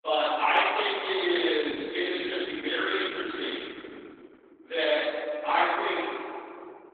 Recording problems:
room echo; strong; dies away in 3 s
off-mic speech; far
garbled, watery; badly; nothing above 3.5 kHz
thin; very slightly; fading below 250 Hz

